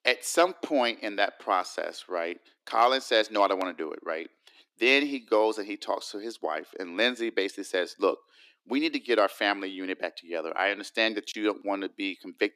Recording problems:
thin; somewhat; fading below 300 Hz

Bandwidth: 14.5 kHz